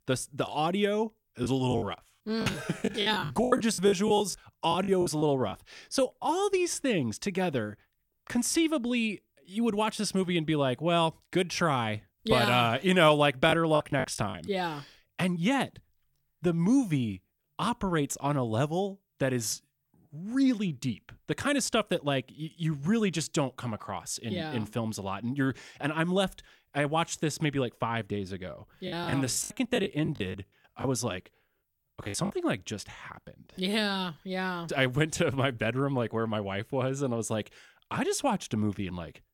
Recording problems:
choppy; very; from 1.5 to 5.5 s, at 14 s and from 29 to 32 s; 18% of the speech affected

